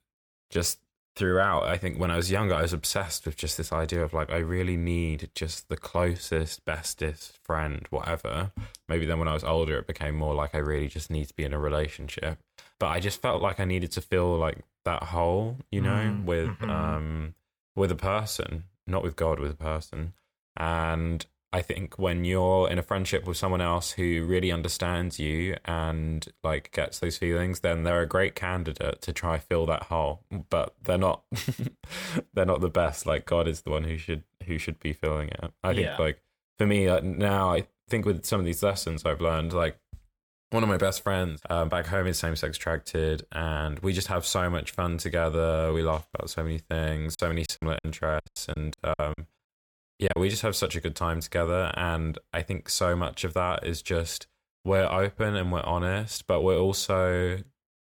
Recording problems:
choppy; very; from 47 to 50 s; 21% of the speech affected

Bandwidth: 18 kHz